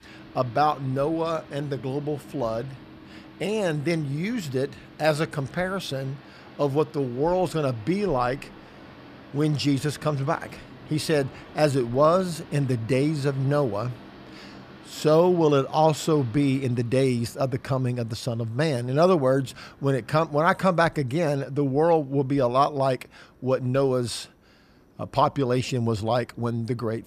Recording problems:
train or aircraft noise; faint; throughout; 20 dB below the speech

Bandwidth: 14.5 kHz